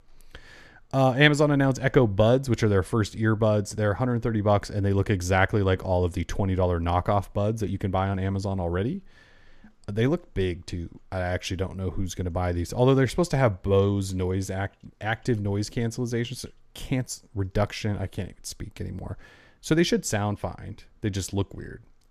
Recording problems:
none

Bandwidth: 14 kHz